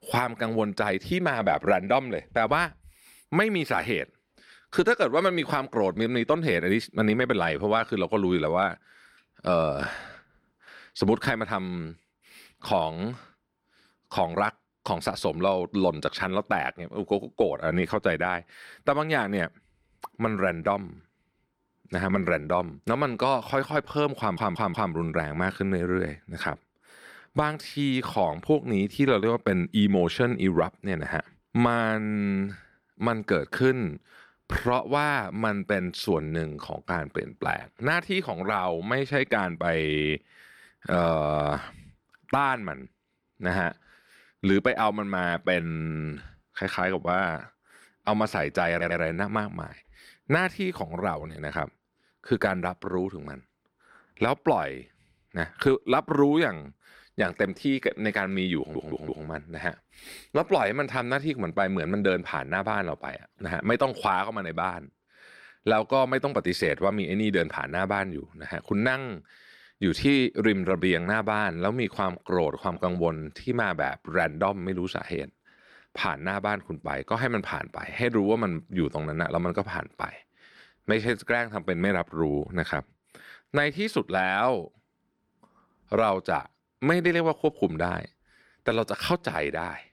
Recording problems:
audio stuttering; at 24 s, at 49 s and at 59 s

